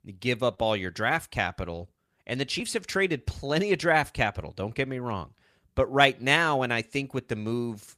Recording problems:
none

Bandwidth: 15 kHz